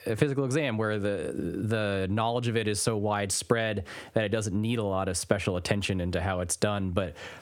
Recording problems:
squashed, flat; heavily

